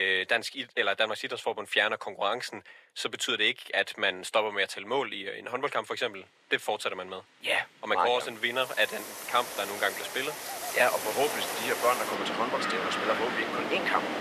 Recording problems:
thin; very; fading below 600 Hz
wind in the background; loud; from 9 s on; 4 dB below the speech
rain or running water; noticeable; throughout; 20 dB below the speech
abrupt cut into speech; at the start

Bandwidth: 14.5 kHz